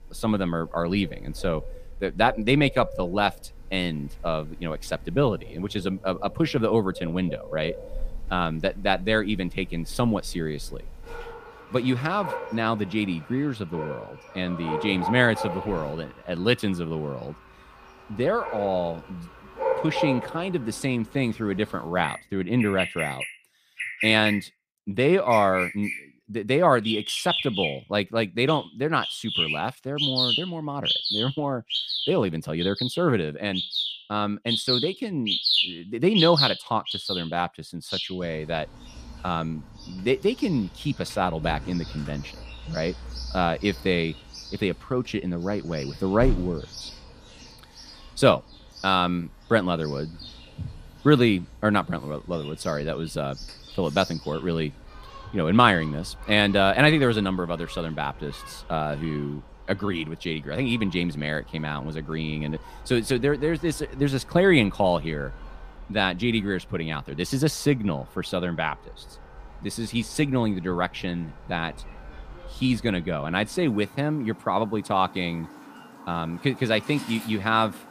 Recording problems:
animal sounds; loud; throughout; 5 dB below the speech

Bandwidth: 15 kHz